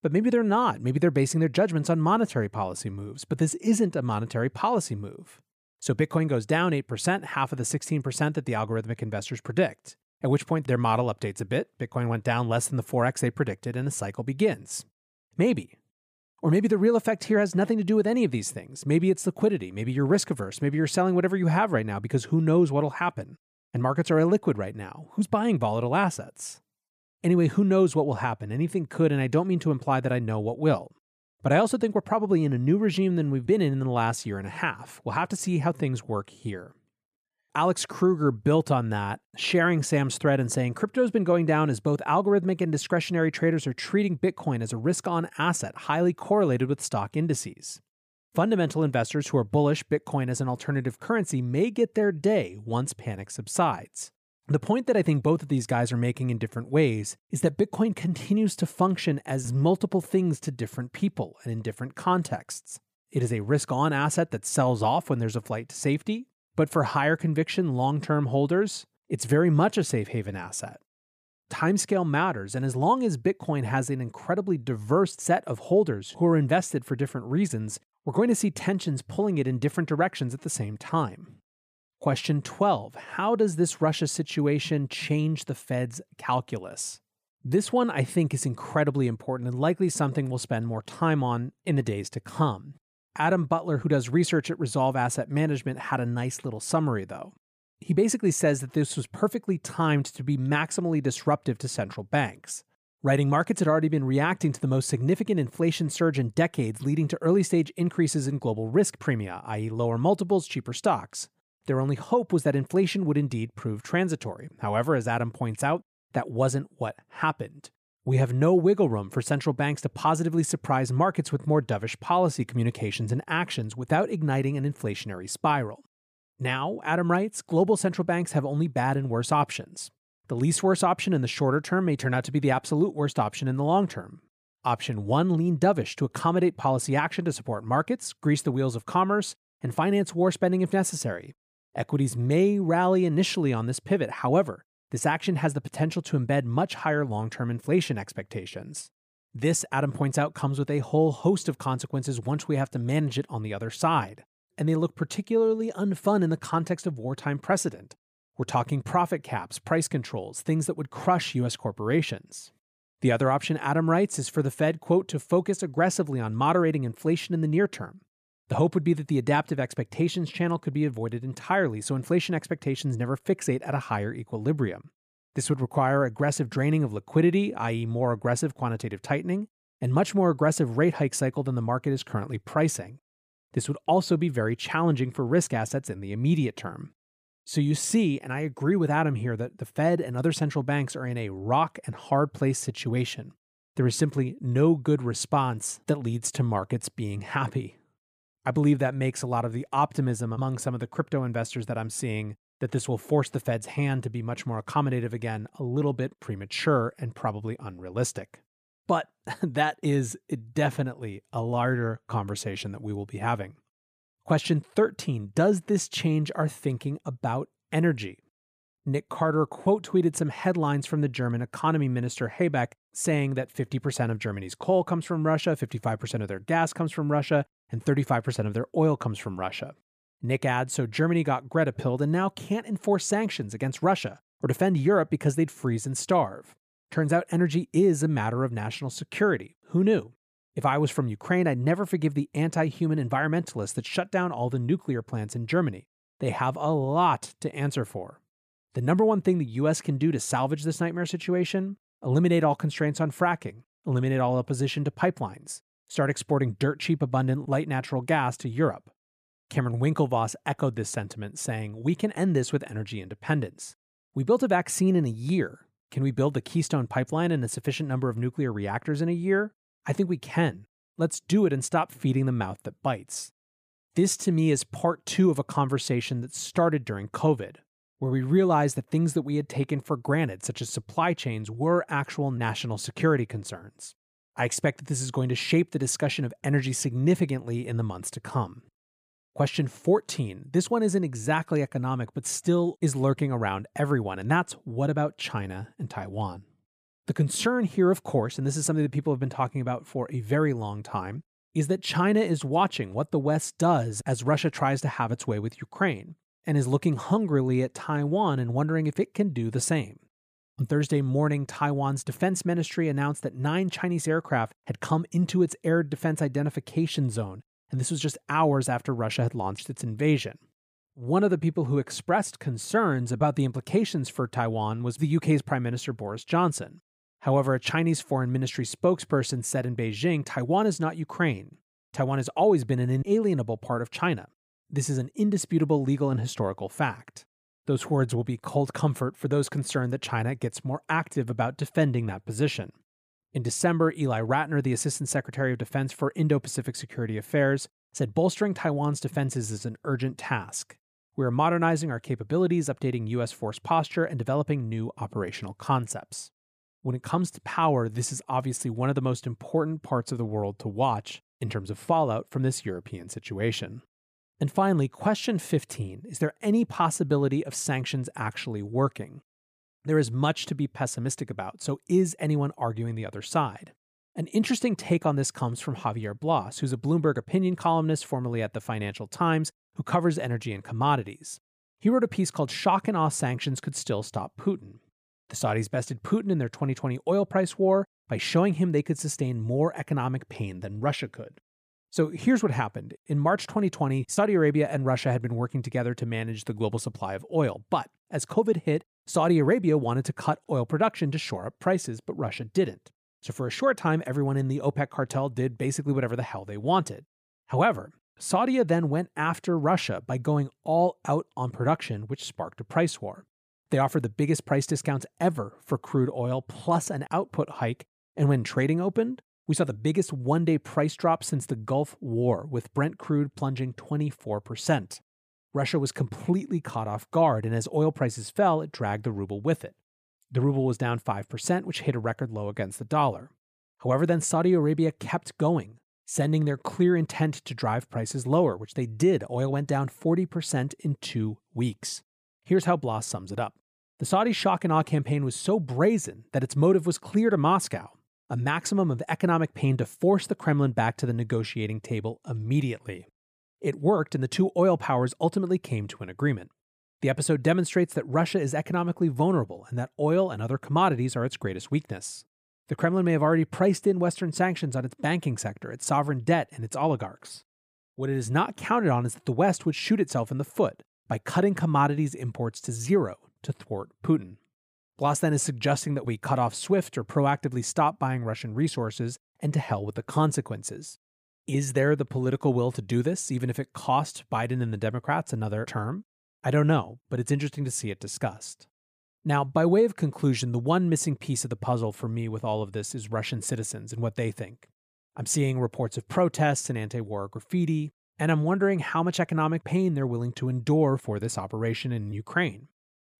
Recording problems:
none

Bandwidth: 15 kHz